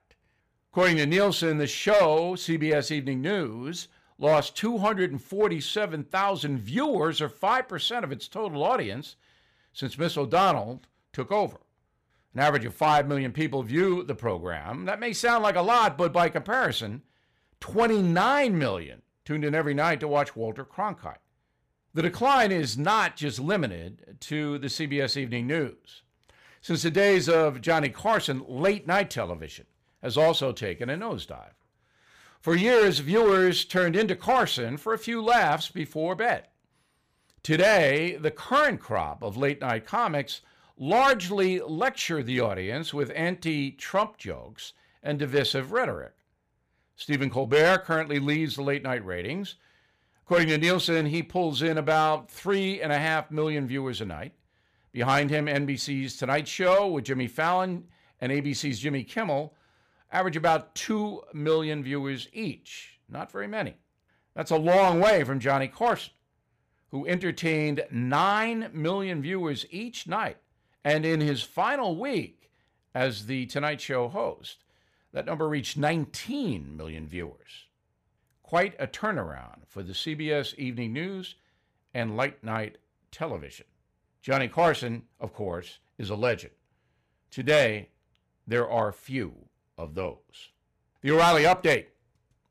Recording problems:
distortion; slight; 3% of the sound clipped

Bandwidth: 15 kHz